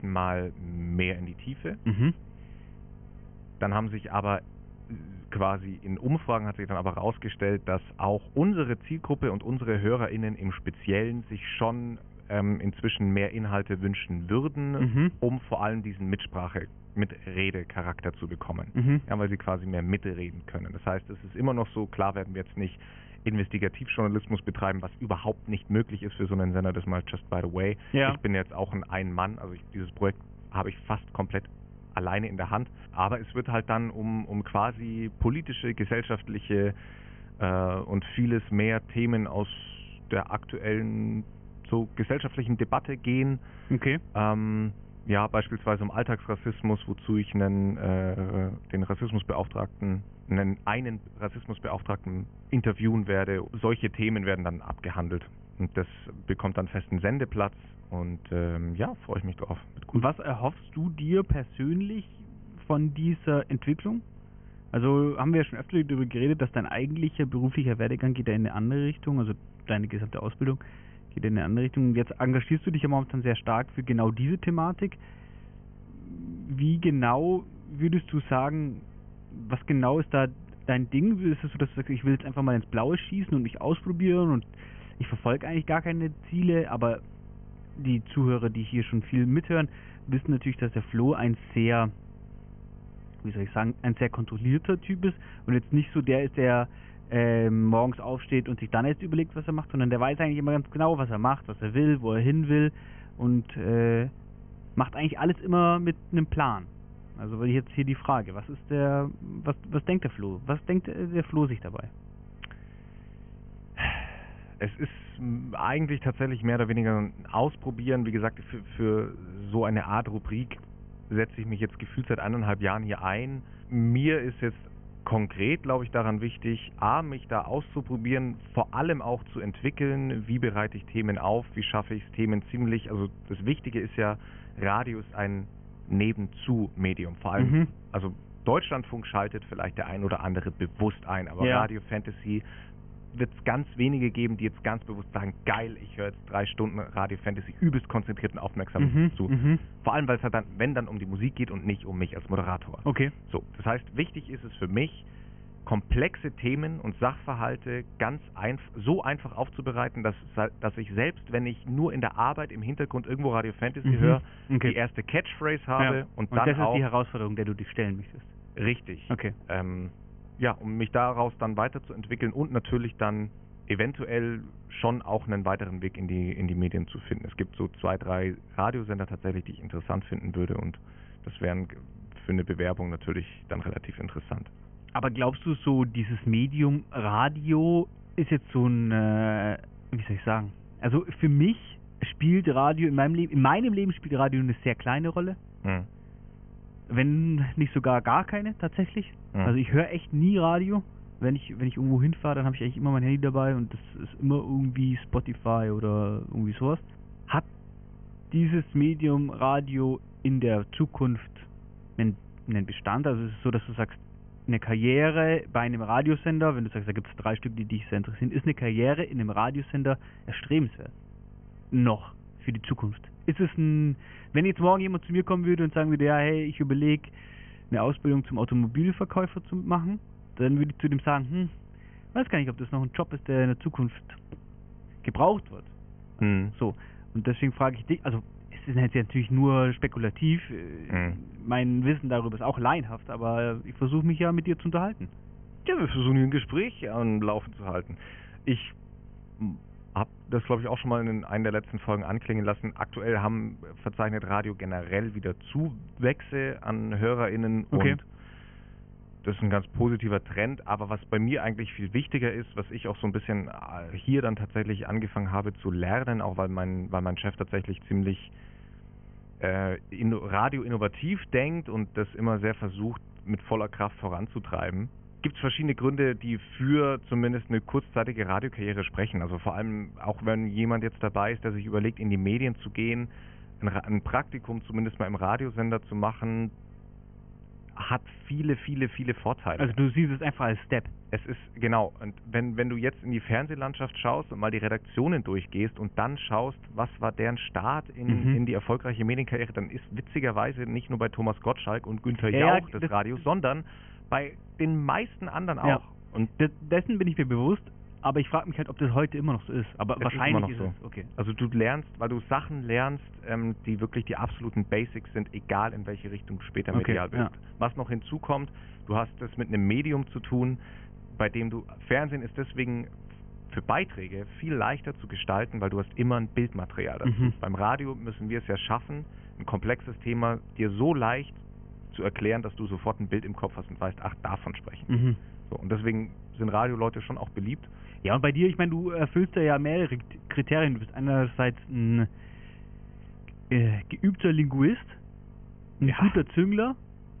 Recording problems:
high frequencies cut off; severe; nothing above 3 kHz
electrical hum; faint; throughout; 50 Hz, 30 dB below the speech

